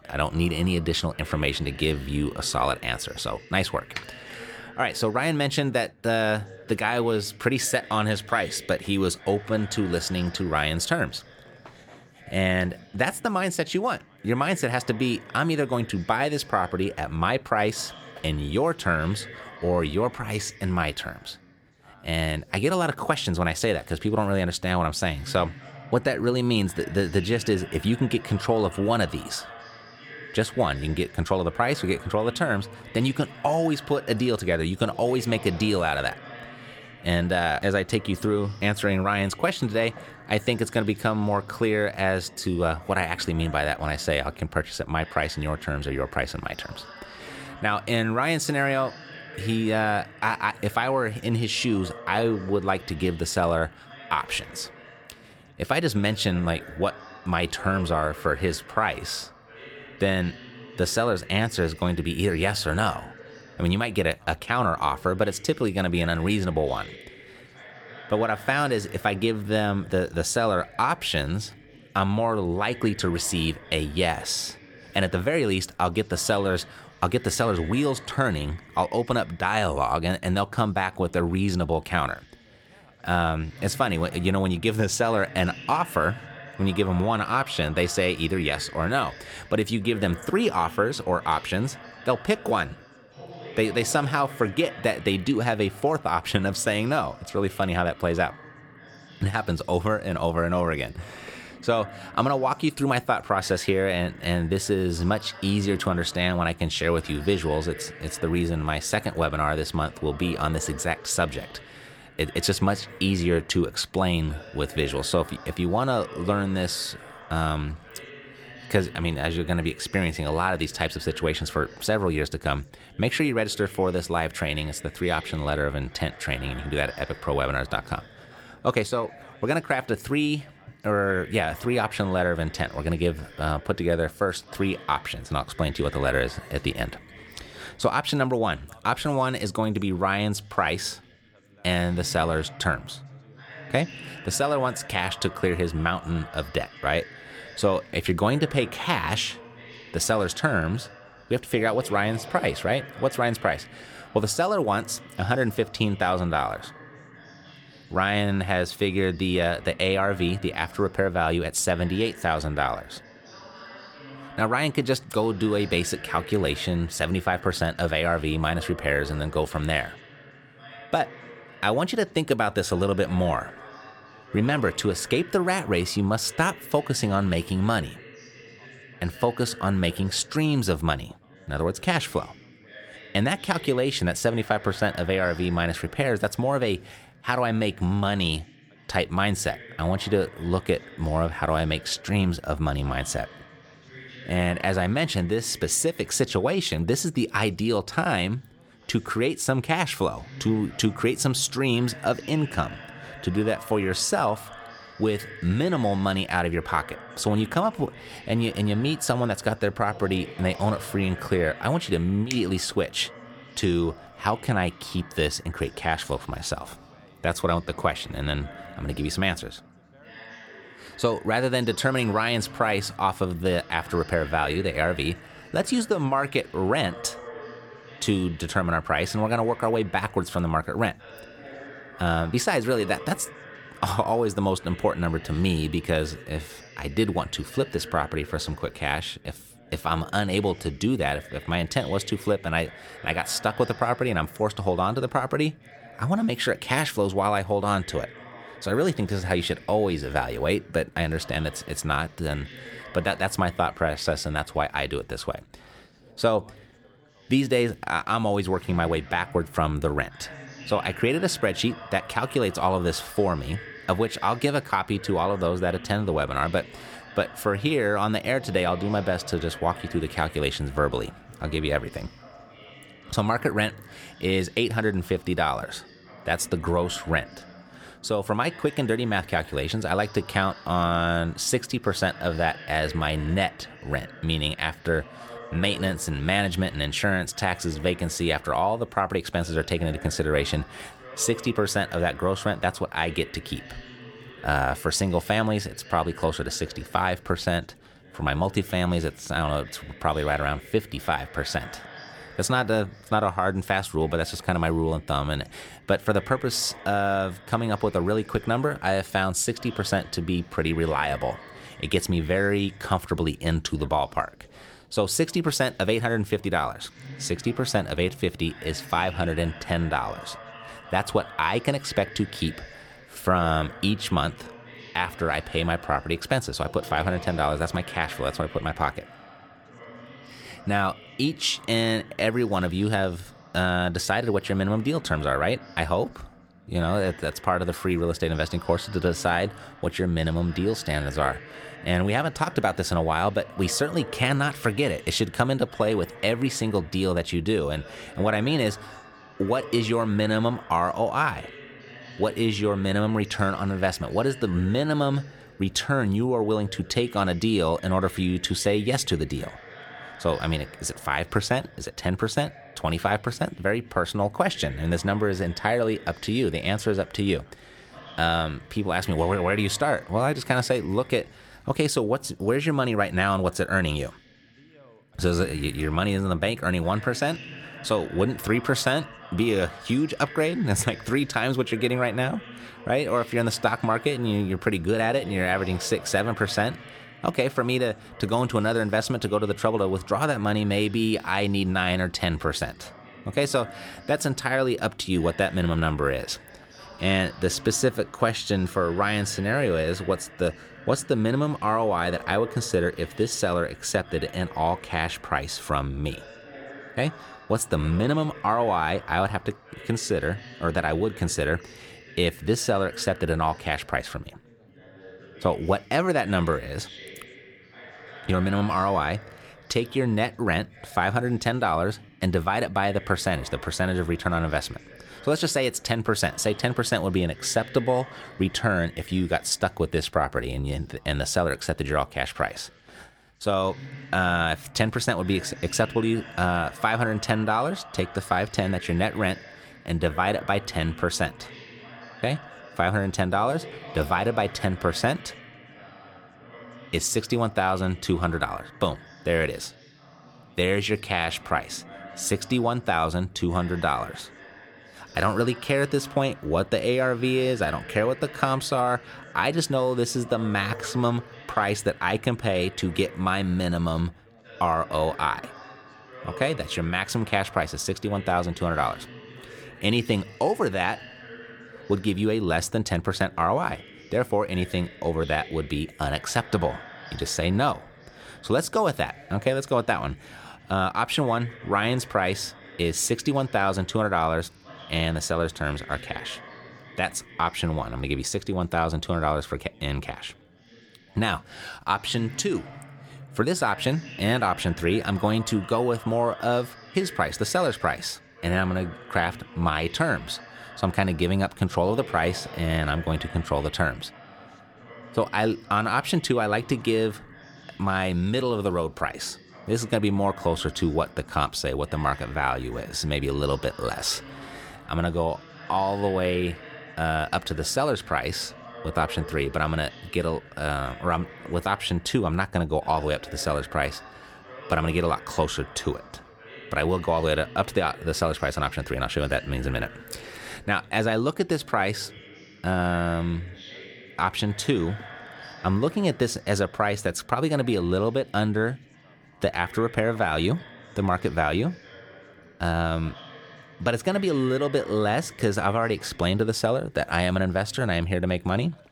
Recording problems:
background chatter; noticeable; throughout; 4 voices, 20 dB below the speech

